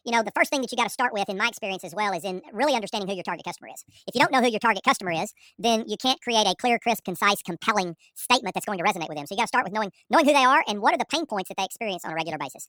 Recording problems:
wrong speed and pitch; too fast and too high; 1.5 times normal speed

